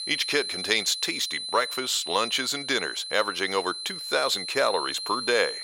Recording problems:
thin; very; fading below 500 Hz
high-pitched whine; loud; throughout; 4 kHz, 6 dB below the speech

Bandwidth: 16 kHz